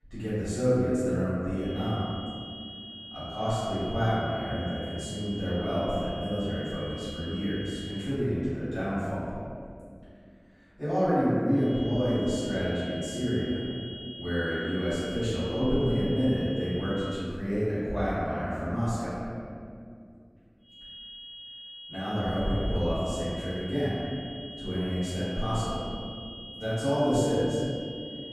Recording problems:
room echo; strong; dies away in 2.3 s
off-mic speech; far
high-pitched whine; noticeable; from 1.5 to 8 s, from 12 to 17 s and from 21 s on; 3.5 kHz, 10 dB below the speech

